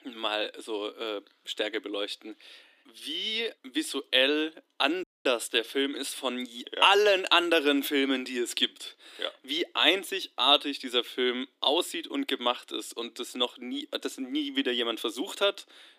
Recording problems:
thin; somewhat; fading below 300 Hz
audio cutting out; at 5 s

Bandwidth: 15 kHz